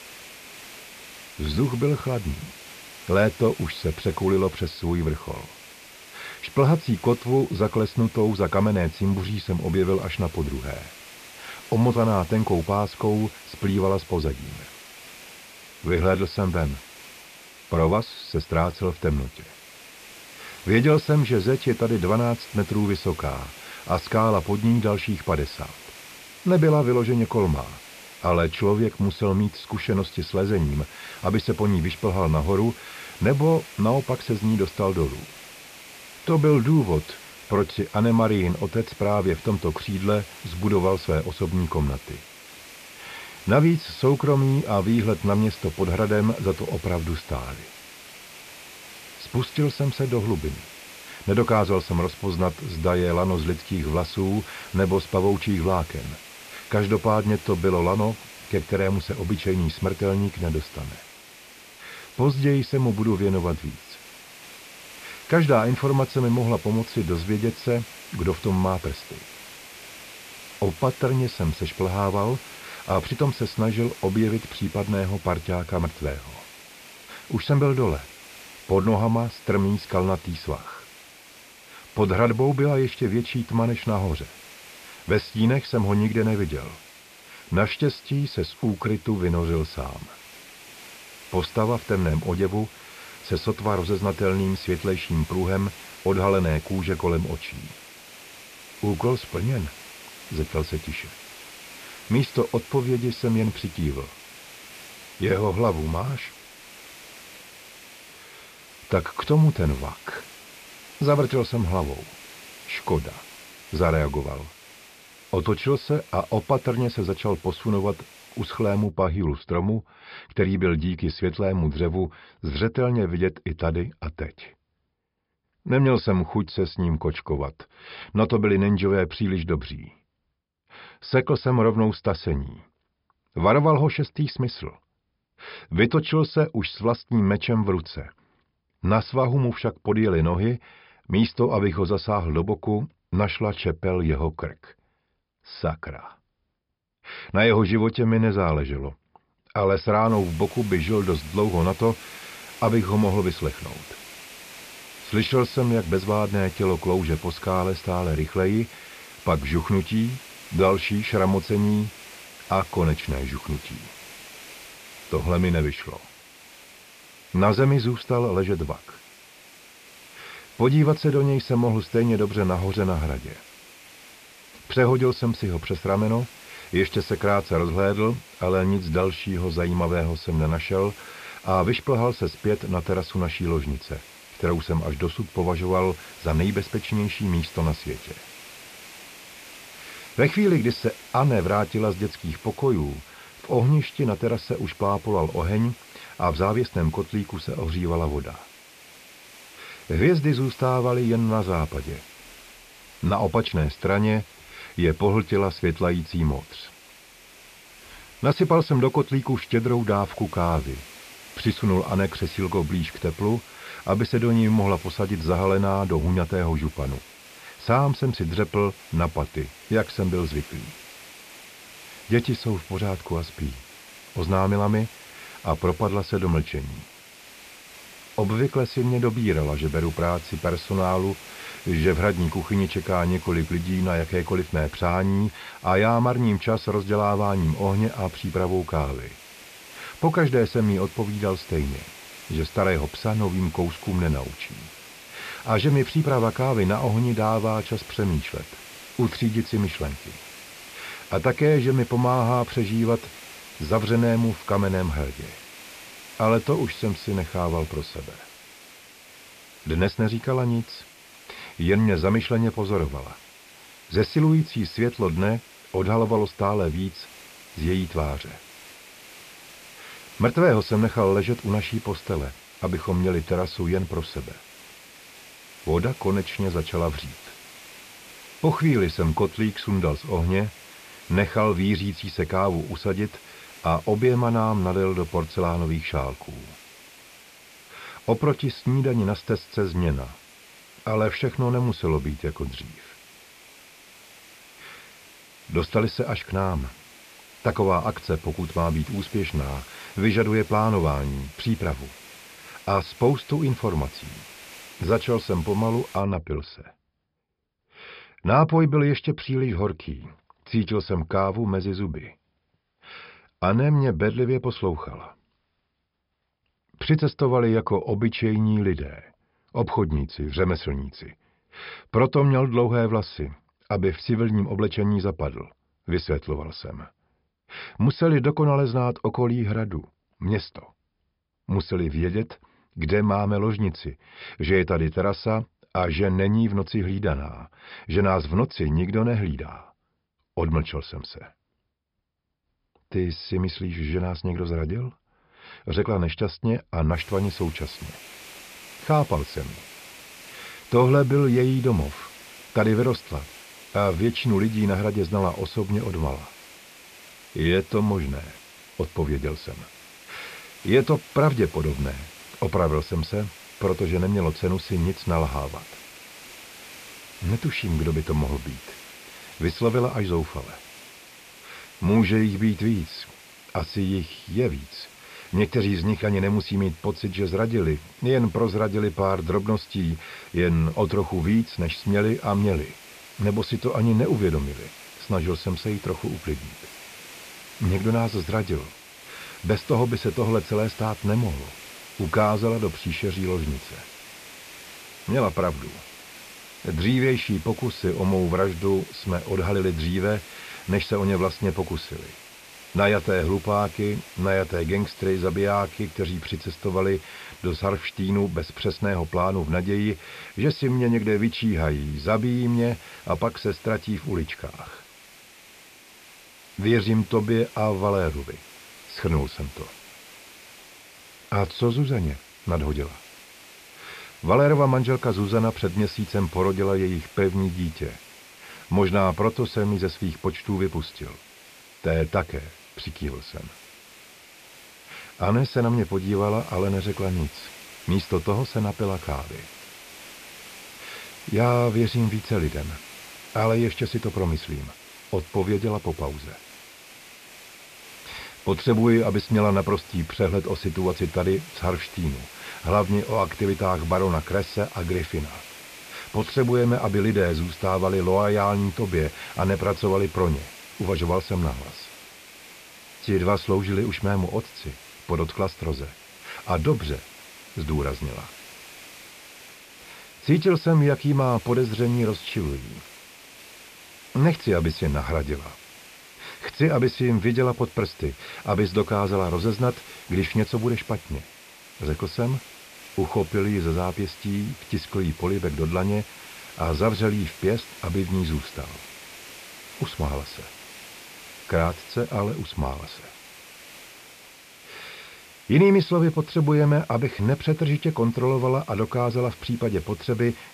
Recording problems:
high frequencies cut off; noticeable; nothing above 5.5 kHz
hiss; noticeable; until 1:59, from 2:30 to 5:06 and from 5:47 on; 20 dB below the speech

